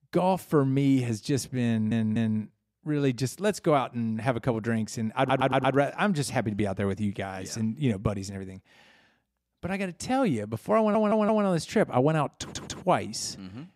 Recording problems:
audio stuttering; 4 times, first at 1.5 s

